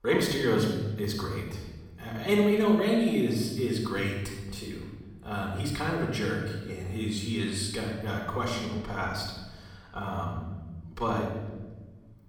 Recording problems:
off-mic speech; far
room echo; noticeable; dies away in 1.3 s

